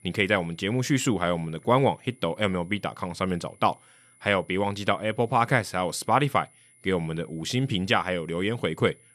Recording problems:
high-pitched whine; faint; throughout; 10 kHz, 30 dB below the speech

